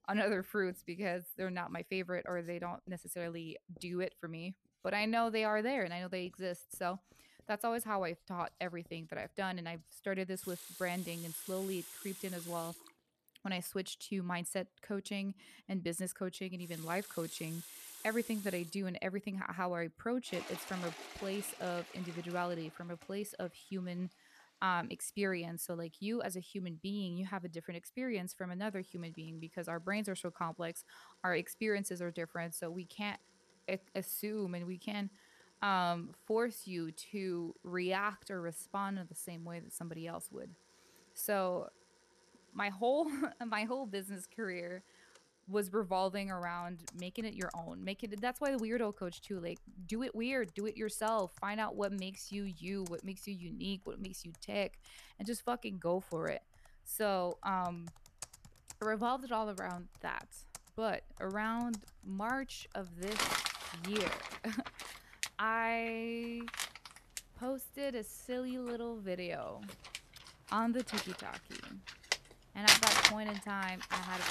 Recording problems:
household noises; very loud; throughout; 1 dB above the speech

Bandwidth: 13.5 kHz